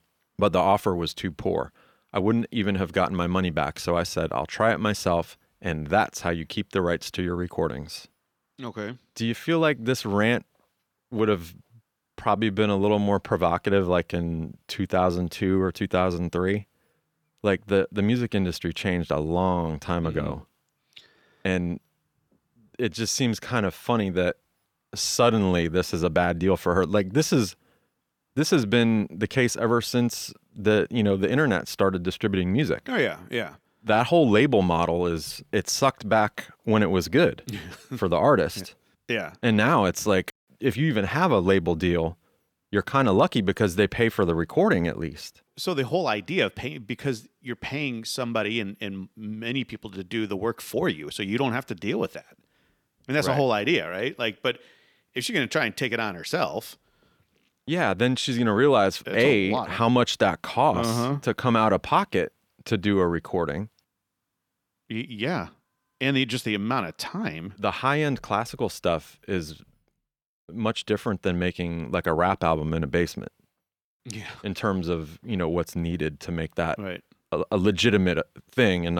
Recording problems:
abrupt cut into speech; at the end

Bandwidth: 18.5 kHz